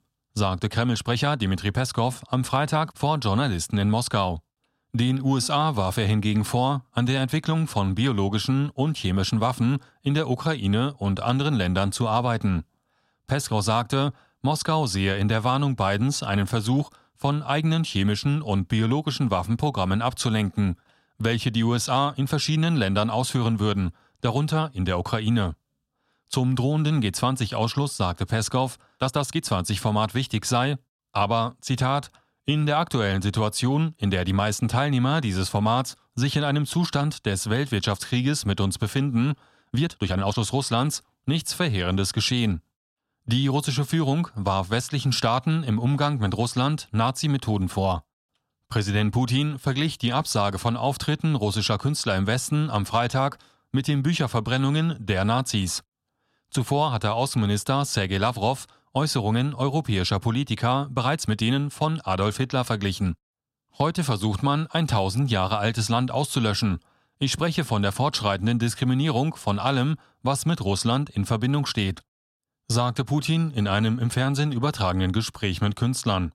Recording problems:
uneven, jittery; strongly; from 1 s to 1:02

